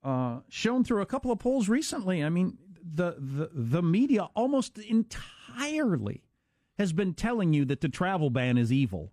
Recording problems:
none

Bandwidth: 14.5 kHz